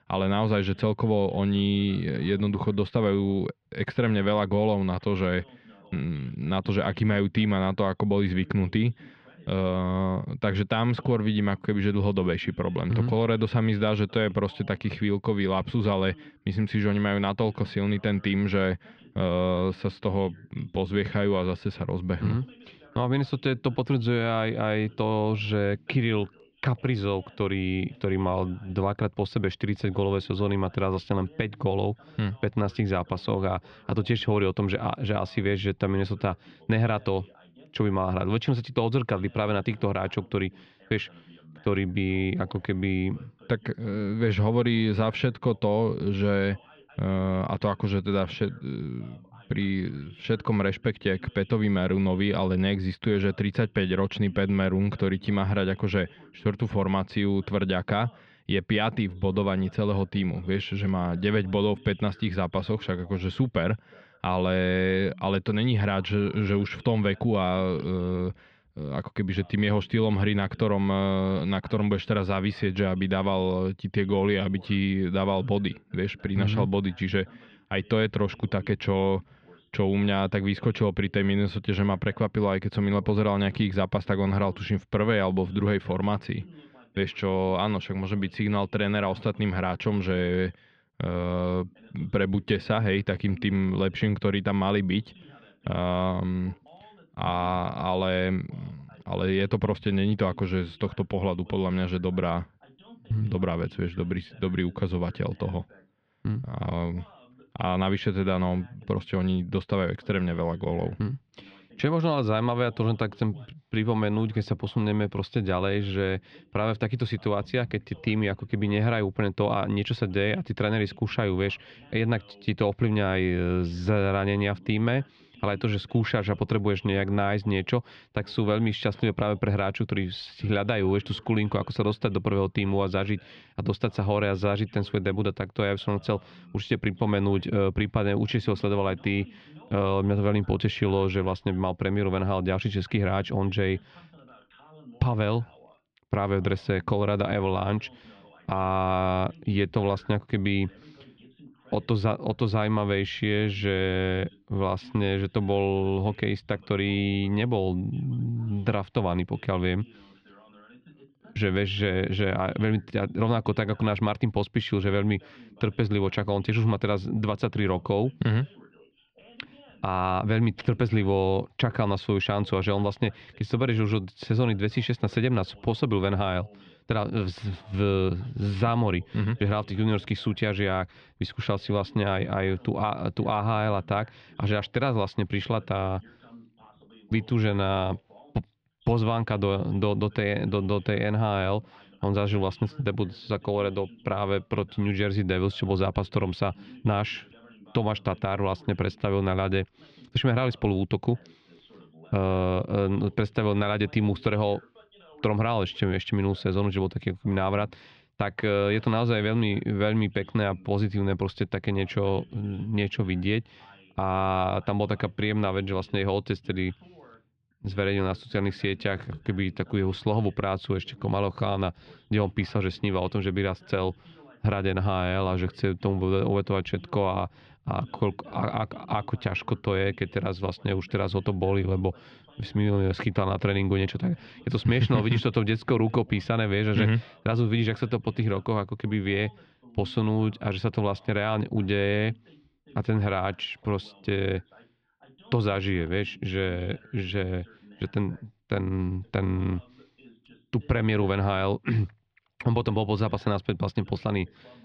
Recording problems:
muffled; slightly; fading above 3.5 kHz
voice in the background; faint; throughout; 25 dB below the speech

